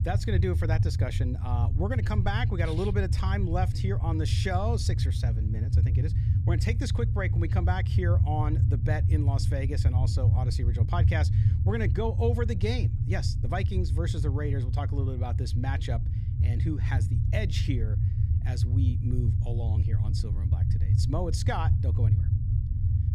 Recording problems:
low rumble; loud; throughout; 6 dB below the speech

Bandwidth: 14.5 kHz